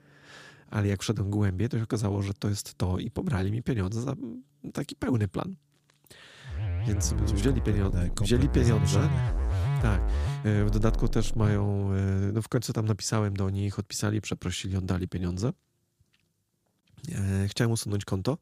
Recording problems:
background music; loud; until 12 s; 2 dB below the speech

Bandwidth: 15 kHz